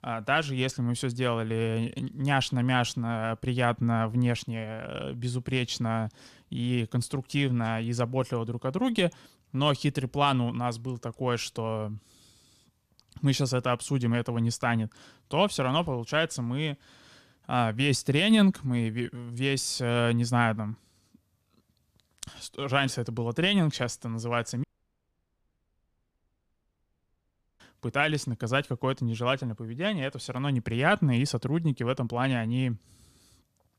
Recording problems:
audio cutting out; at 25 s for 3 s

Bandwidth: 14.5 kHz